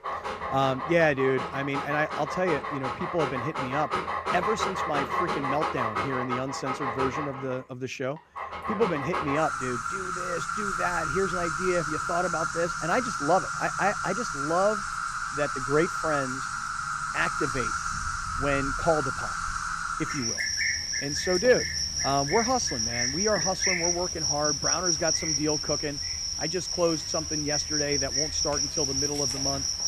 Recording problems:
animal sounds; very loud; throughout; 1 dB above the speech

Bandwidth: 15 kHz